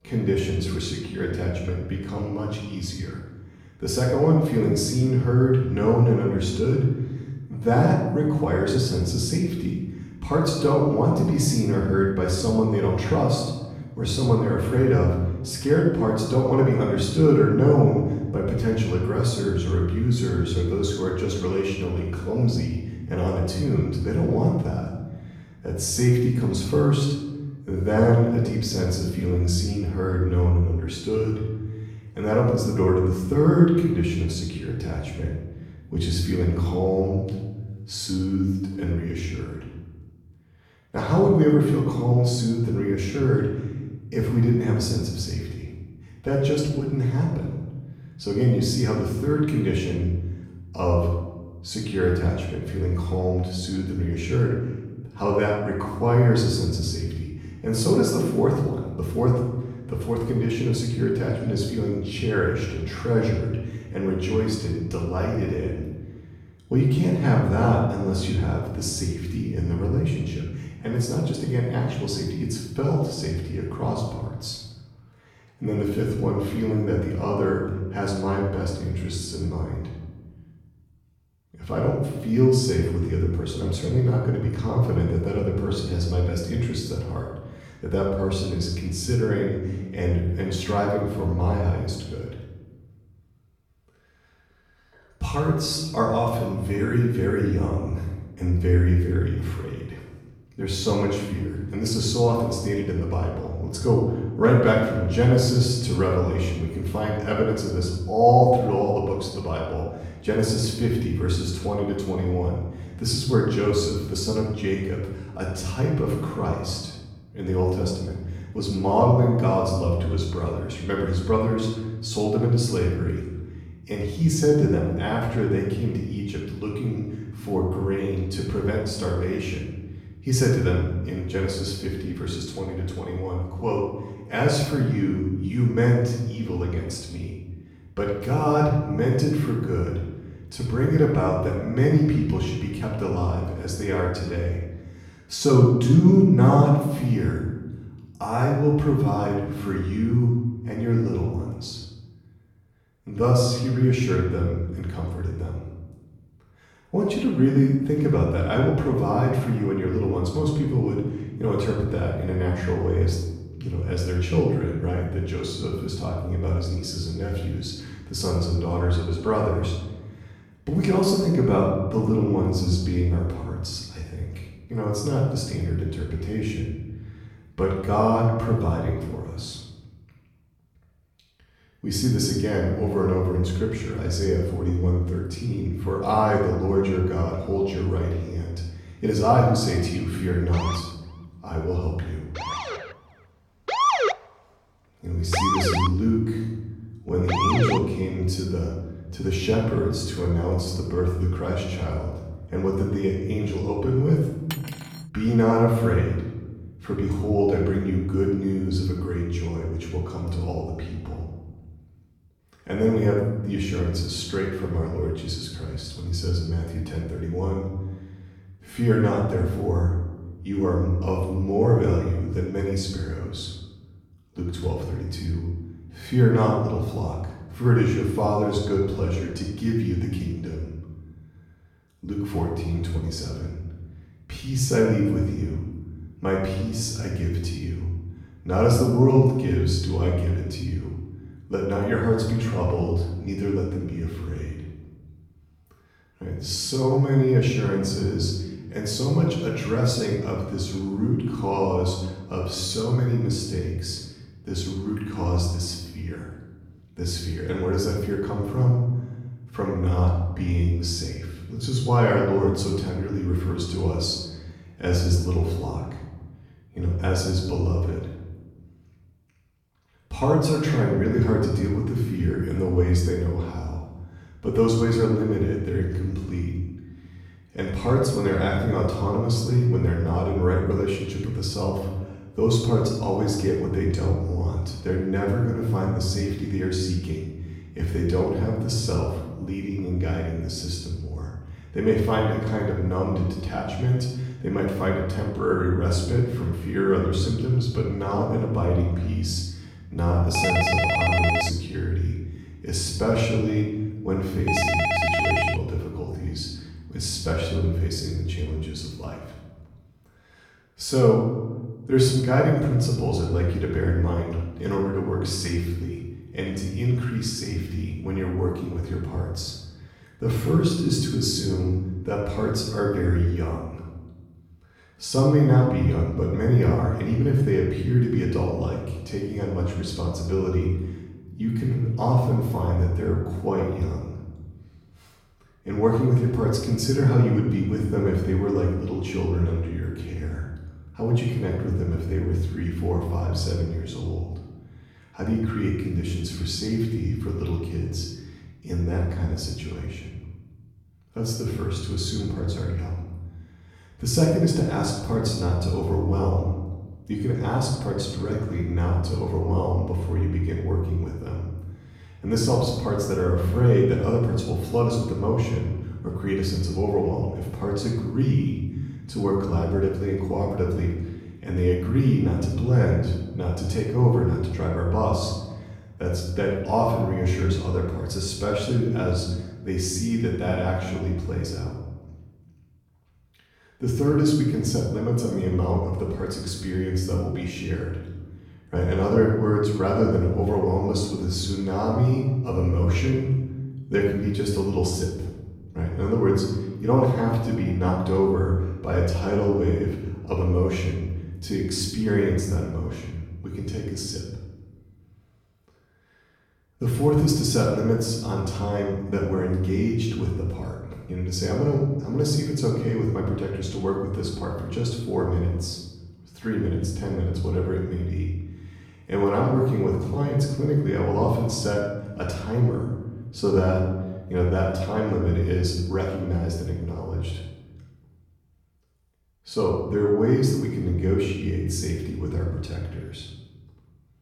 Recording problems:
off-mic speech; far
room echo; noticeable; dies away in 1.2 s
siren; loud; from 3:11 to 3:18; peak 4 dB above the speech
clattering dishes; faint; at 3:25; peak 10 dB below the speech
phone ringing; loud; from 5:00 to 5:06; peak 3 dB above the speech

